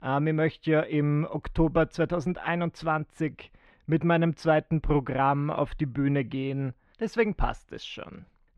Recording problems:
muffled; slightly; fading above 2.5 kHz

